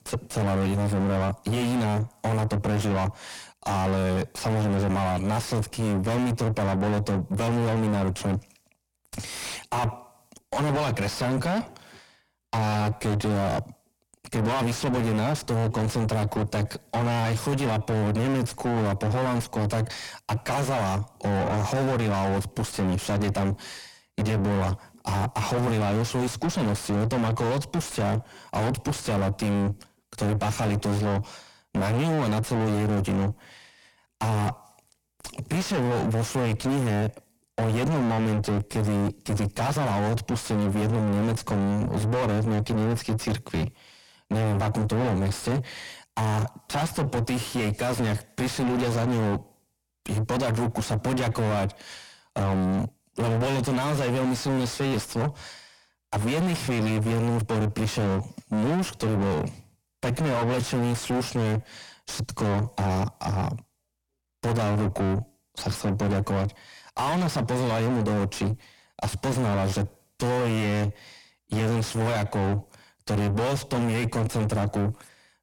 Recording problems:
distortion; heavy; 5 dB below the speech

